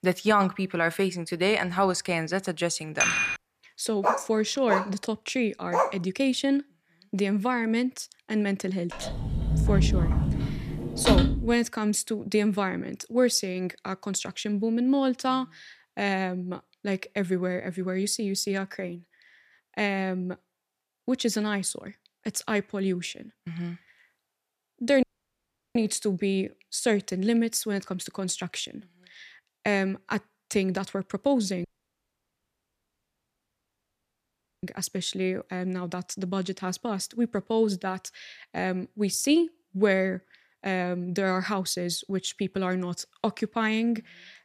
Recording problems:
clattering dishes; loud; at 3 s; peak 5 dB above the speech
dog barking; loud; from 4 to 6 s; peak 1 dB above the speech
door banging; loud; from 9 to 12 s; peak 6 dB above the speech
audio cutting out; at 25 s for 0.5 s and at 32 s for 3 s

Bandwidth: 14.5 kHz